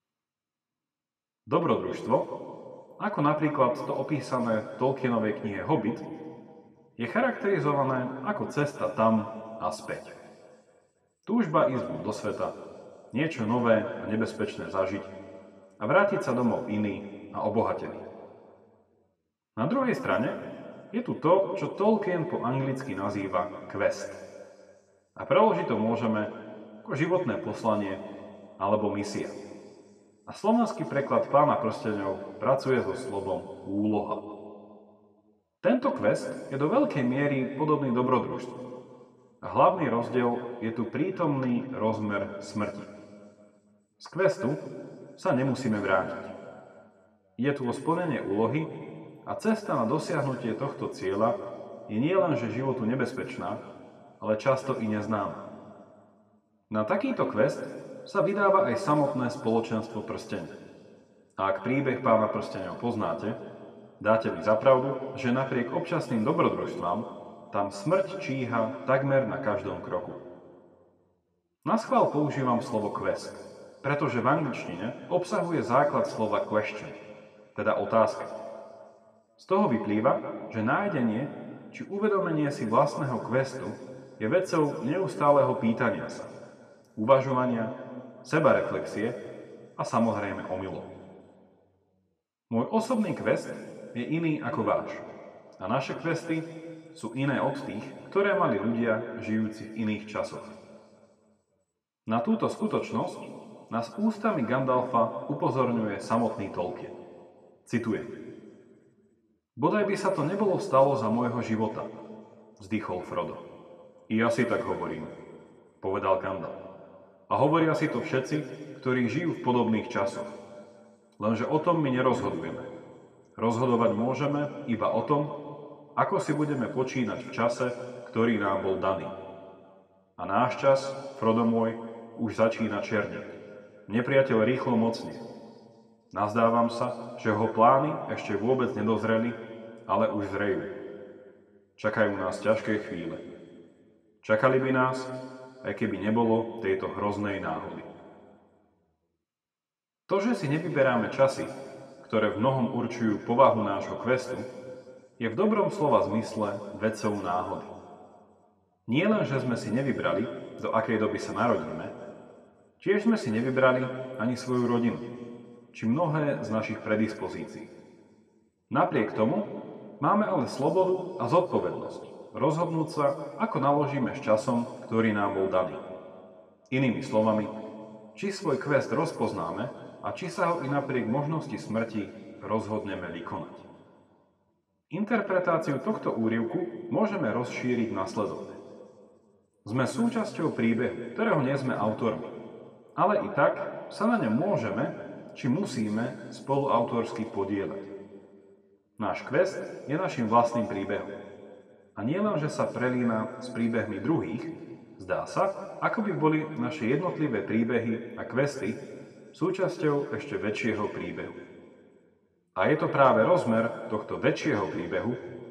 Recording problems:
room echo; slight; dies away in 2 s
off-mic speech; somewhat distant

